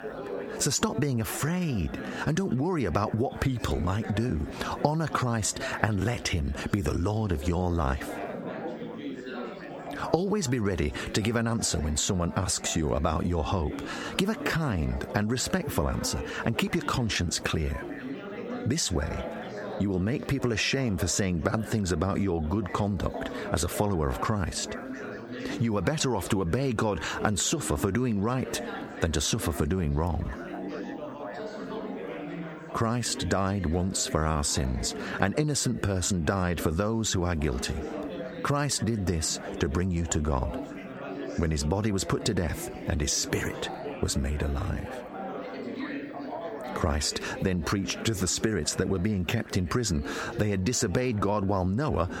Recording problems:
squashed, flat; heavily, background pumping
chatter from many people; noticeable; throughout; 10 dB below the speech

